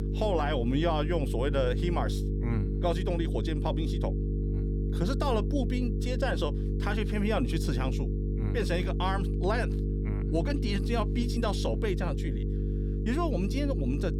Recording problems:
electrical hum; loud; throughout; 50 Hz, 8 dB below the speech

